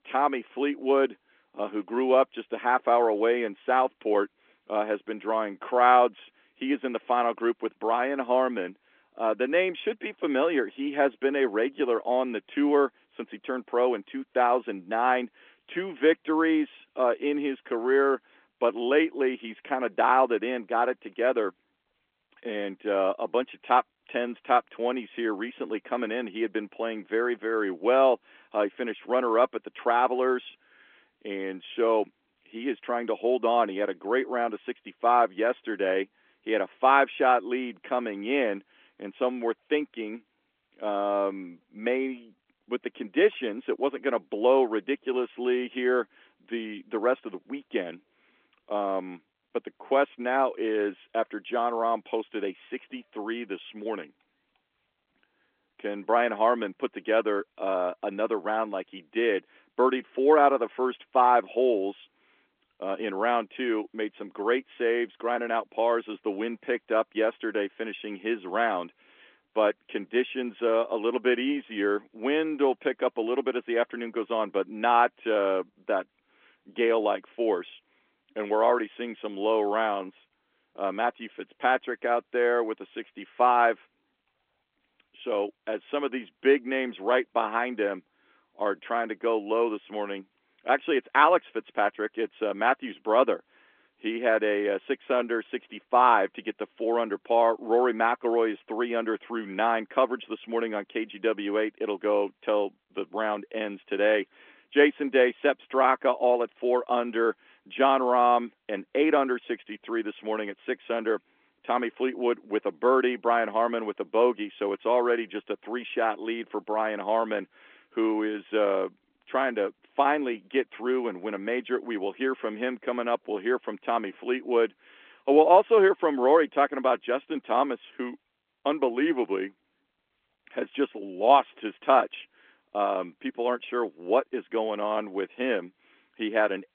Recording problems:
phone-call audio; nothing above 3.5 kHz

